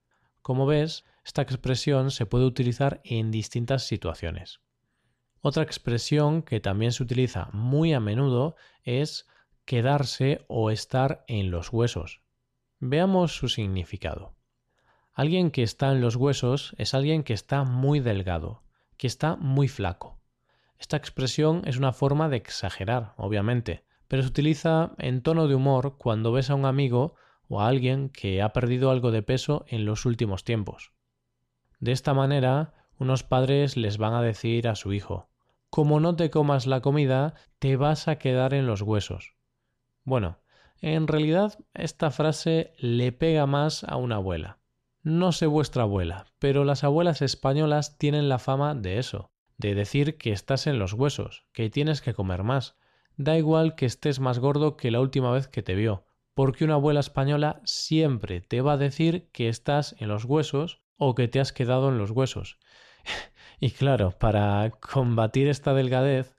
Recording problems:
none

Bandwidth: 14.5 kHz